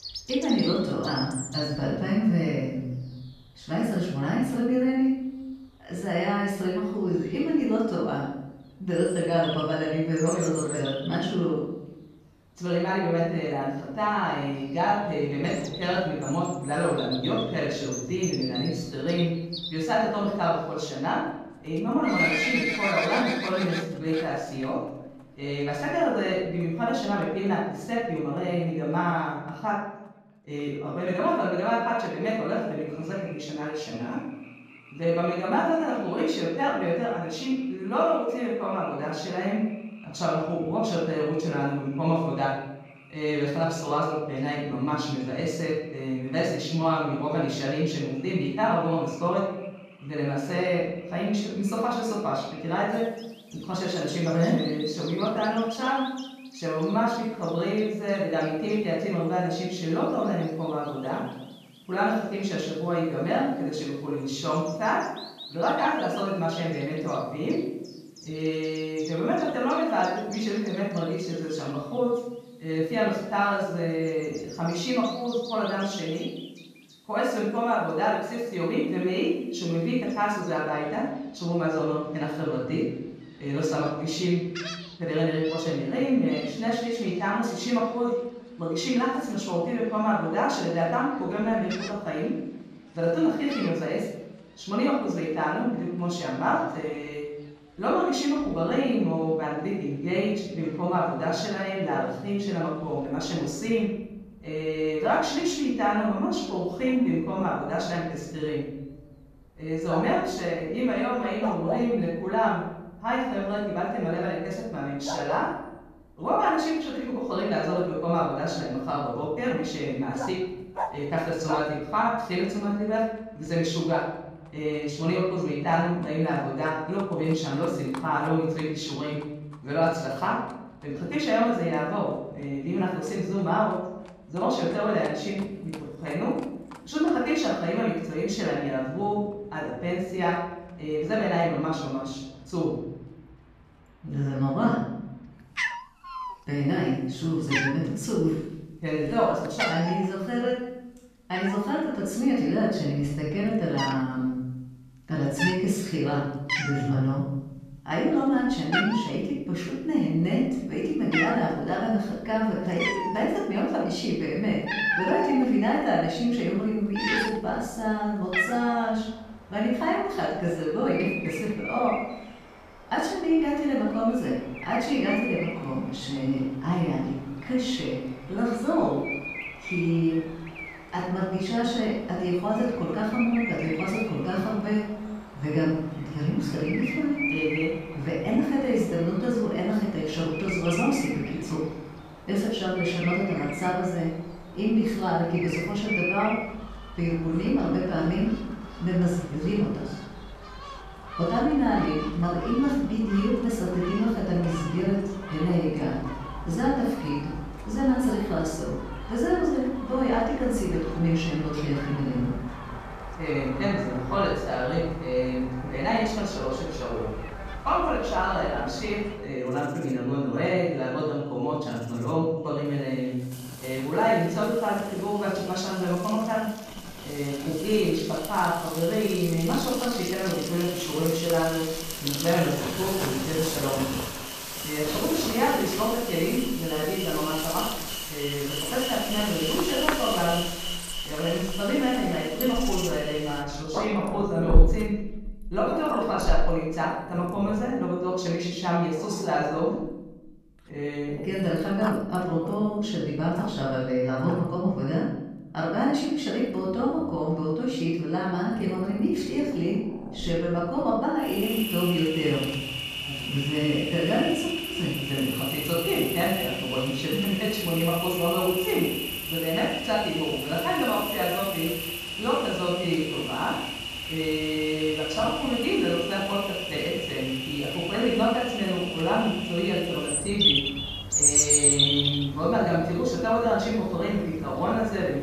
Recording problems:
off-mic speech; far
room echo; noticeable; dies away in 0.8 s
animal sounds; loud; throughout; 5 dB below the speech

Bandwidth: 14.5 kHz